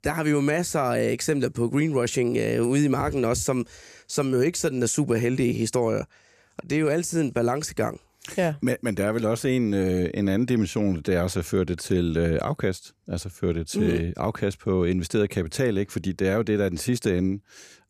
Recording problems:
none

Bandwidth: 14.5 kHz